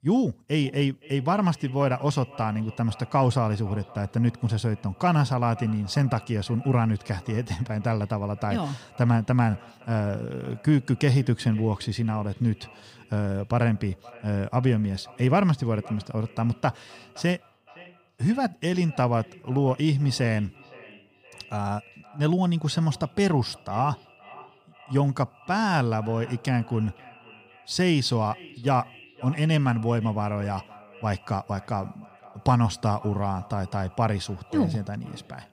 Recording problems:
echo of what is said; faint; throughout; 520 ms later, 25 dB below the speech

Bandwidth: 15.5 kHz